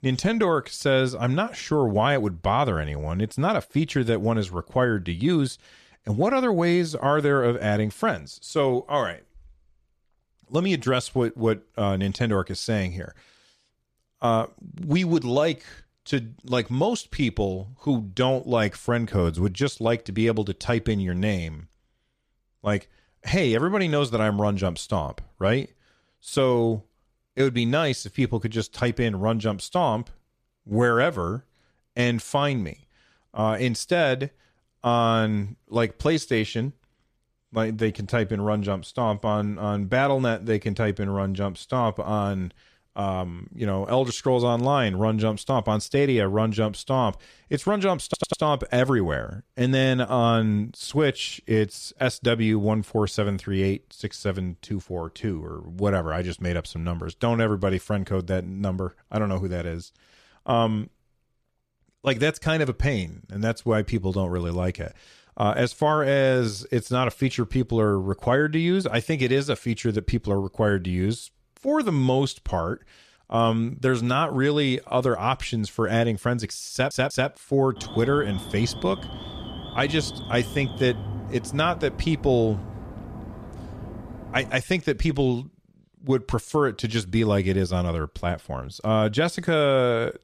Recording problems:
audio stuttering; at 48 s and at 1:17
alarm; noticeable; from 1:18 to 1:25; peak 9 dB below the speech

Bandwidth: 14.5 kHz